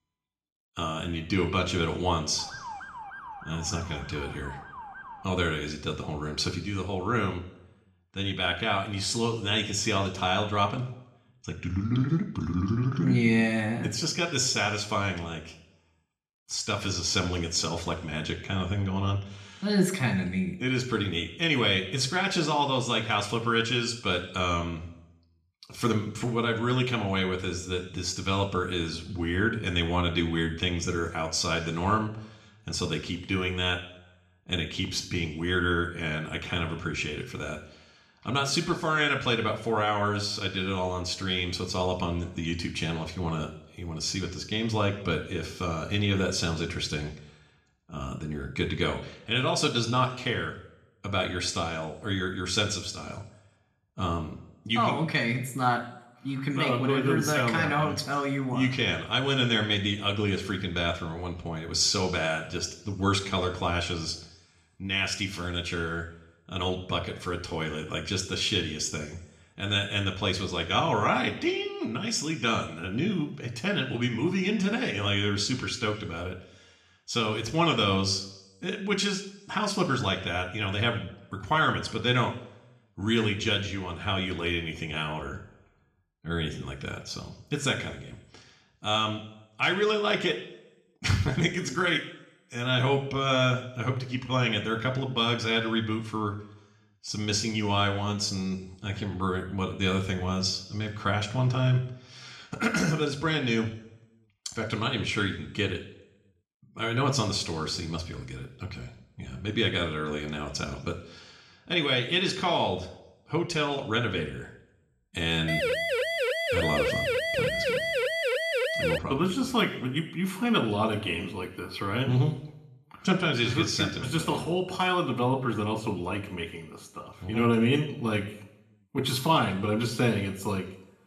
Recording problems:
room echo; slight; dies away in 0.7 s
off-mic speech; somewhat distant
siren; faint; from 2.5 to 5 s; peak 10 dB below the speech
siren; loud; from 1:55 to 1:59; peak 2 dB above the speech

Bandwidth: 13.5 kHz